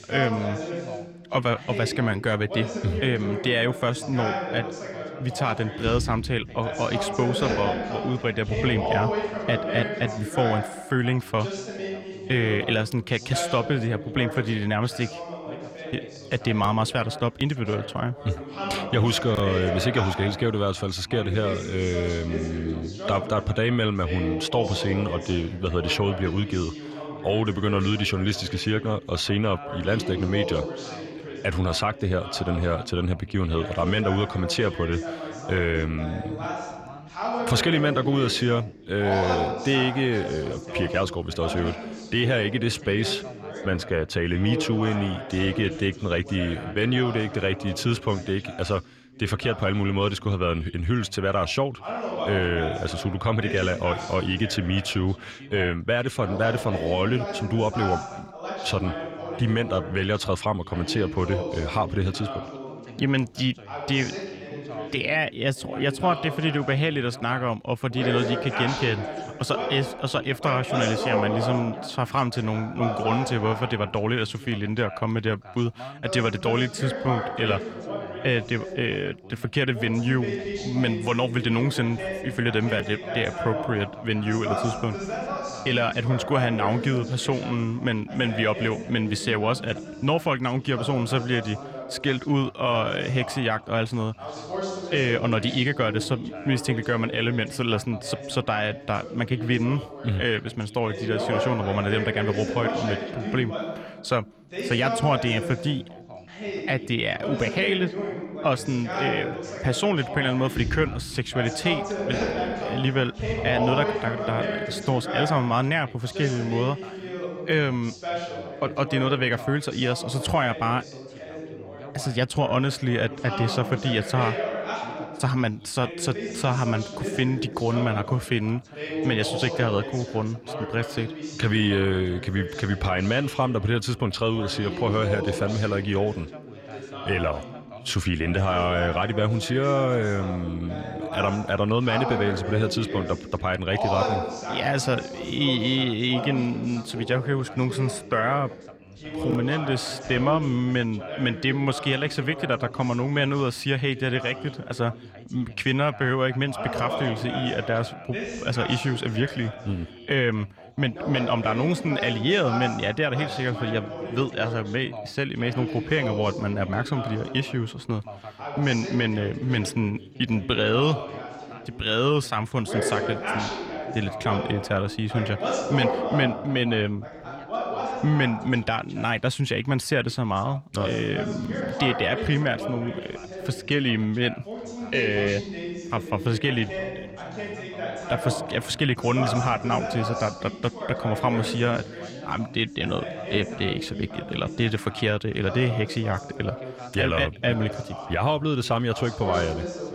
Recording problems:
background chatter; loud; throughout; 2 voices, 7 dB below the speech

